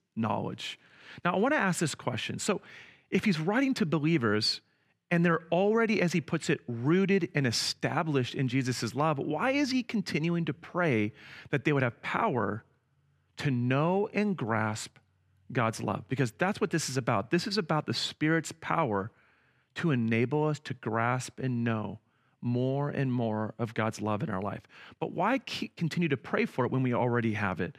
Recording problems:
none

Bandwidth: 14.5 kHz